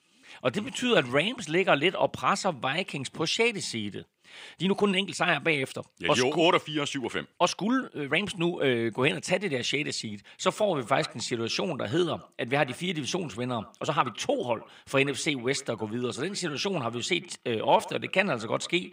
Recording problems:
echo of what is said; faint; from 11 s on; 110 ms later, 20 dB below the speech
thin; very slightly; fading below 800 Hz
uneven, jittery; strongly; from 2.5 to 18 s

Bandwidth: 15.5 kHz